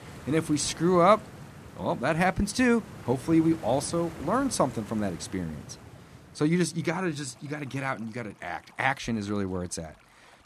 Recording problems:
rain or running water; noticeable; throughout; 15 dB below the speech

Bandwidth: 14.5 kHz